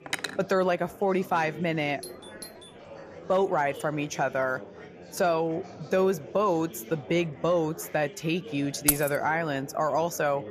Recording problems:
chatter from many people; noticeable; throughout; 15 dB below the speech
clattering dishes; noticeable; at the start; peak 5 dB below the speech
doorbell; faint; at 2 s; peak 15 dB below the speech
jangling keys; loud; at 9 s; peak 3 dB above the speech

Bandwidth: 14.5 kHz